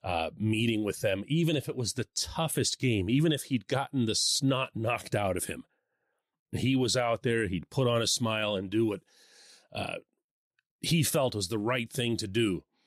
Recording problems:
none

